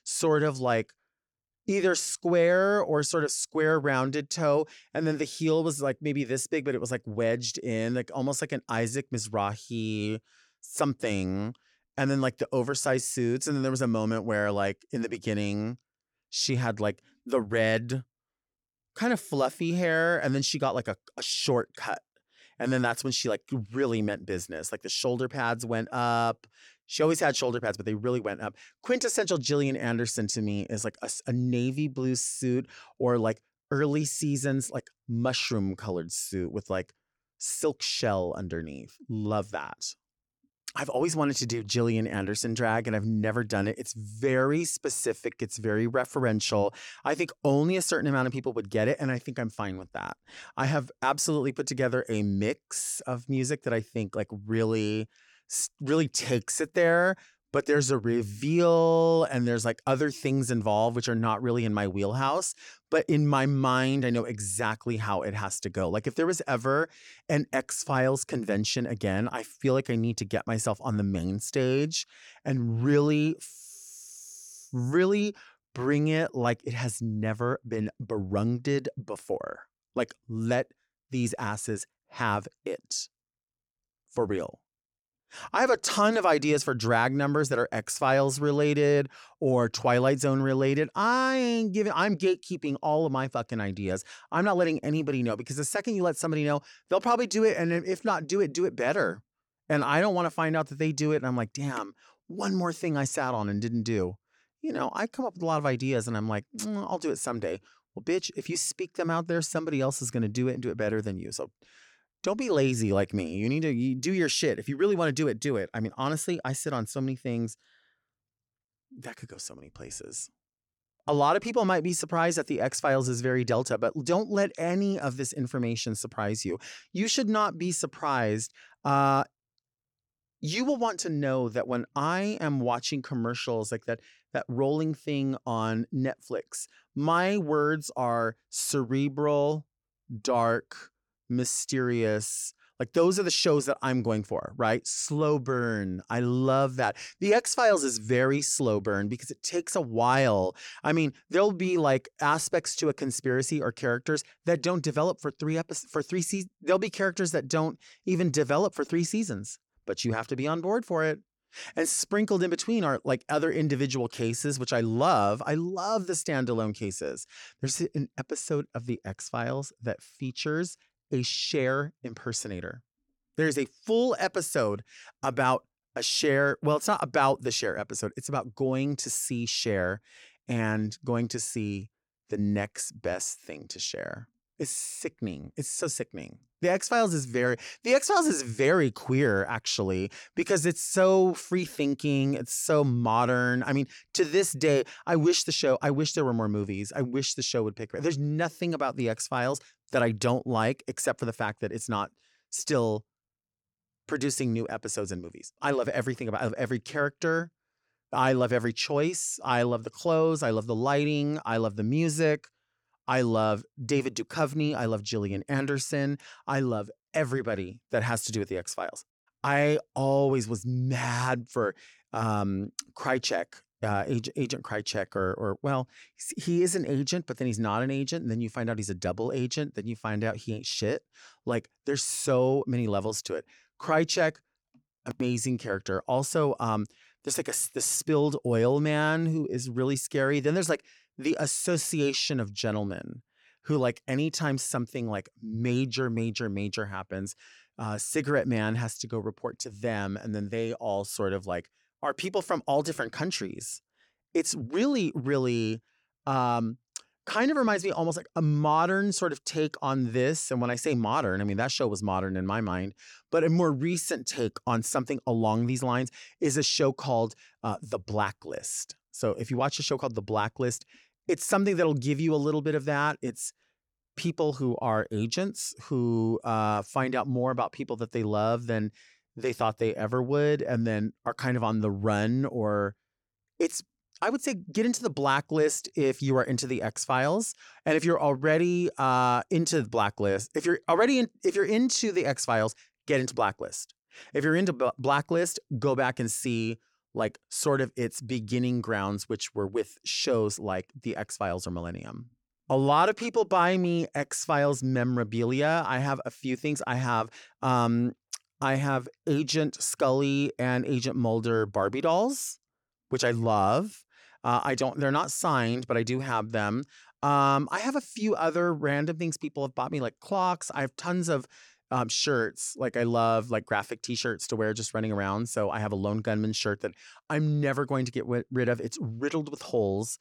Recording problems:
none

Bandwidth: 17.5 kHz